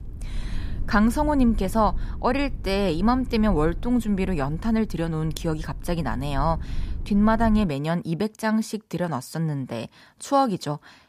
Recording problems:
low rumble; faint; until 7.5 s; 25 dB below the speech

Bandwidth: 14.5 kHz